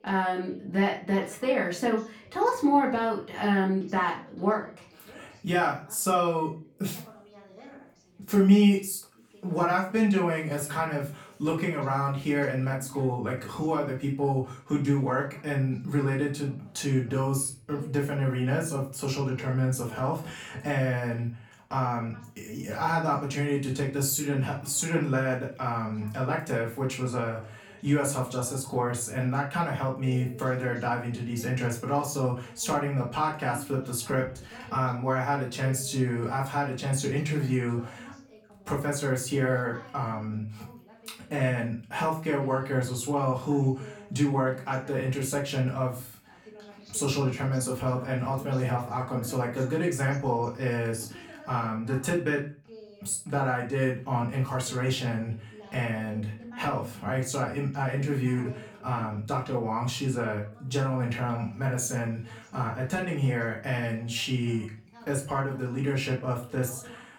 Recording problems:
off-mic speech; far
room echo; slight; dies away in 0.3 s
voice in the background; faint; throughout; 20 dB below the speech

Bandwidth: 18 kHz